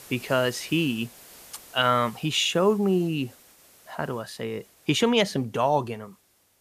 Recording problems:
hiss; faint; throughout; 25 dB below the speech

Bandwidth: 14.5 kHz